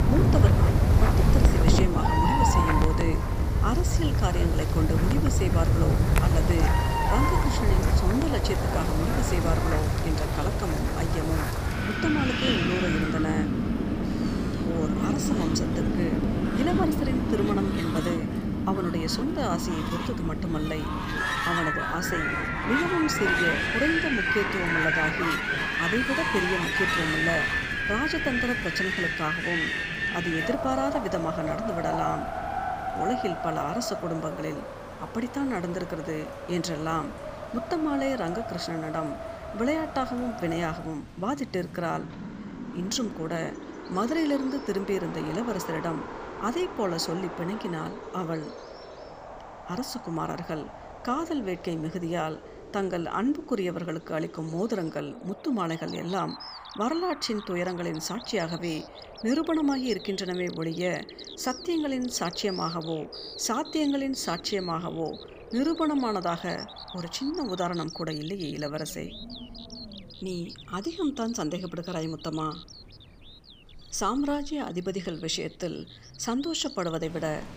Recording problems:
wind in the background; very loud; throughout; 4 dB above the speech
animal sounds; loud; throughout; 8 dB below the speech

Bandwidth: 15 kHz